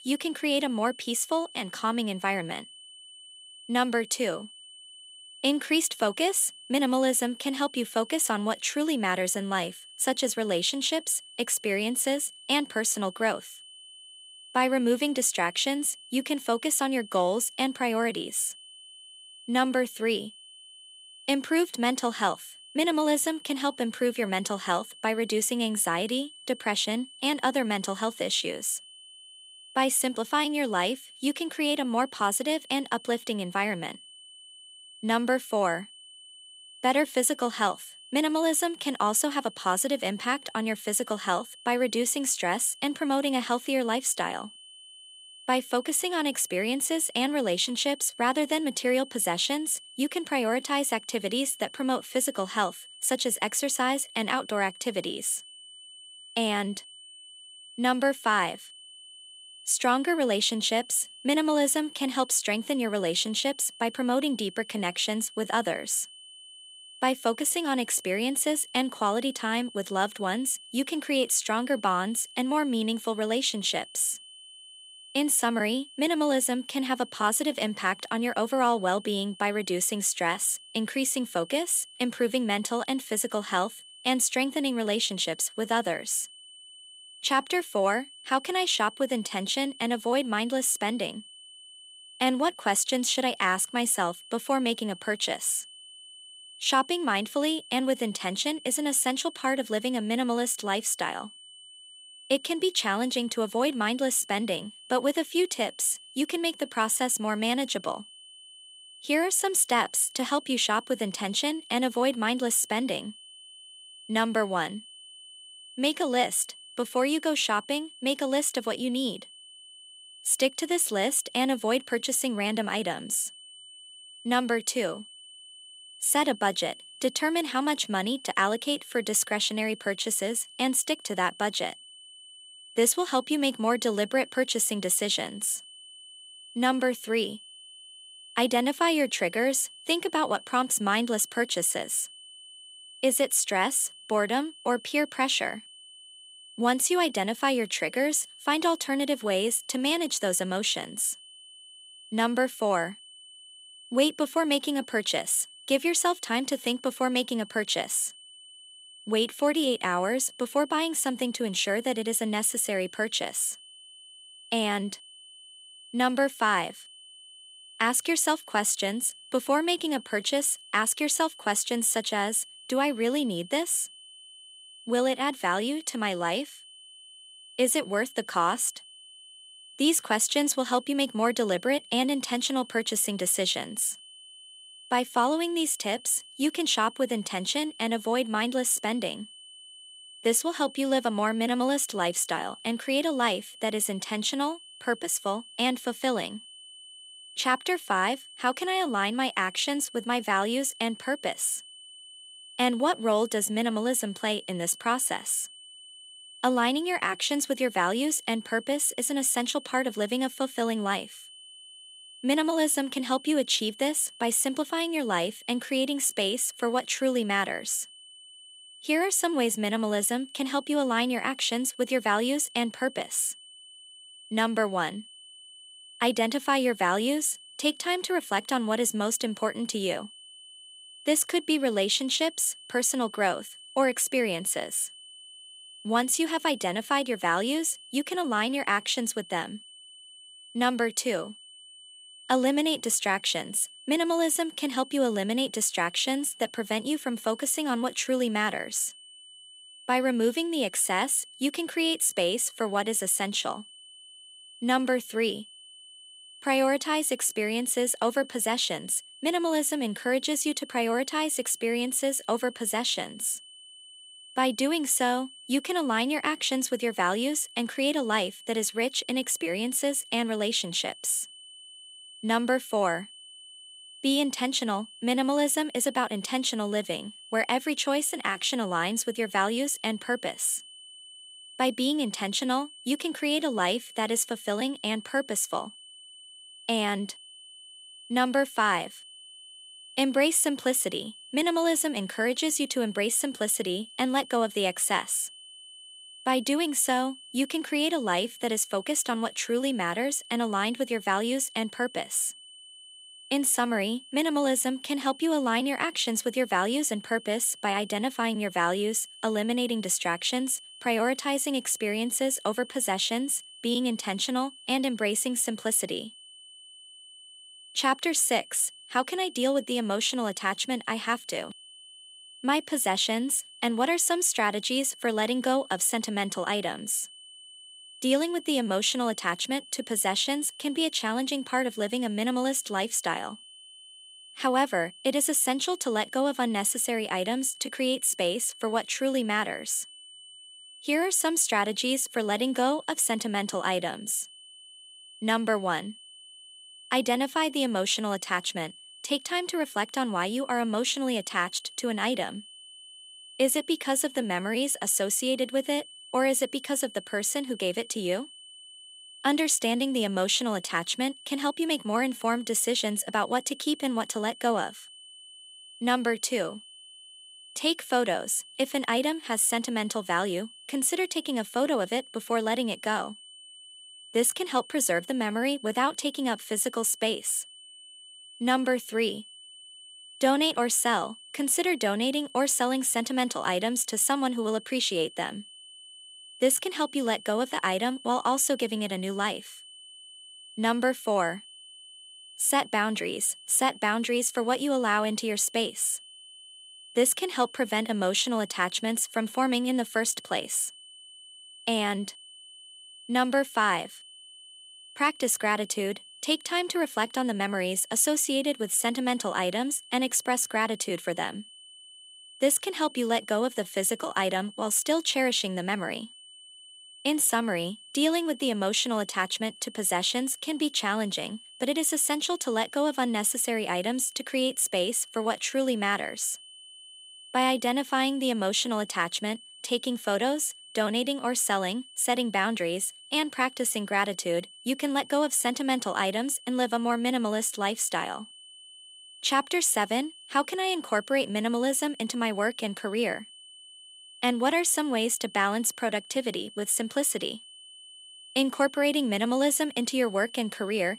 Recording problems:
high-pitched whine; noticeable; throughout; 3 kHz, 20 dB below the speech

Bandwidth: 15.5 kHz